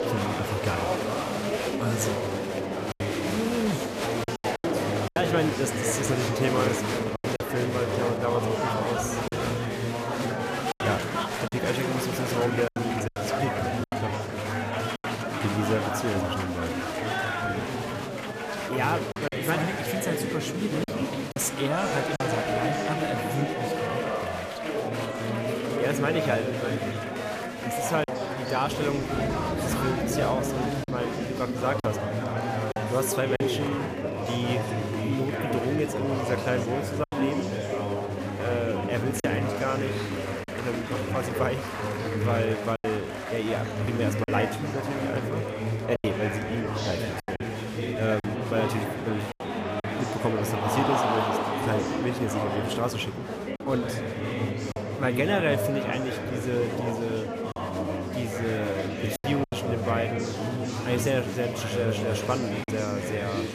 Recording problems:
murmuring crowd; very loud; throughout; 1 dB above the speech
choppy; occasionally; 3% of the speech affected

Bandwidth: 14.5 kHz